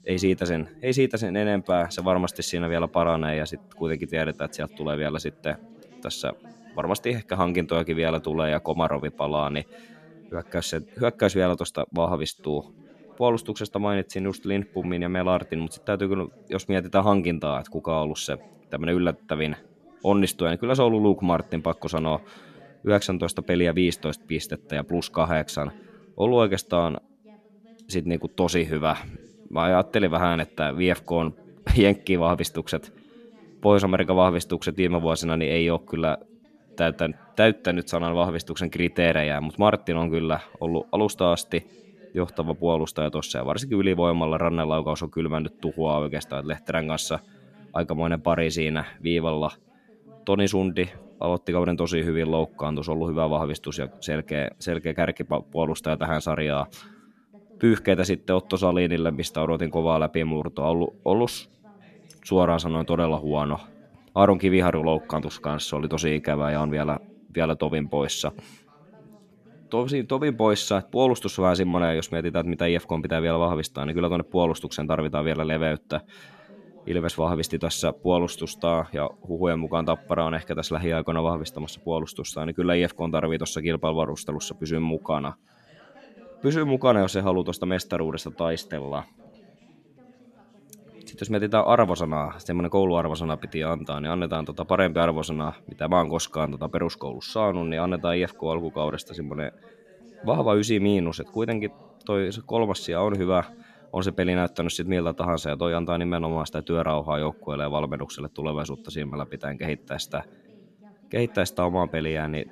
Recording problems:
background chatter; faint; throughout; 2 voices, 25 dB below the speech

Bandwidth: 14 kHz